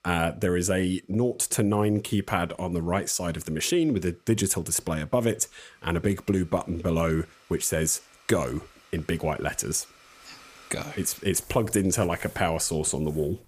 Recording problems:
household noises; faint; throughout; 25 dB below the speech

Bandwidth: 15 kHz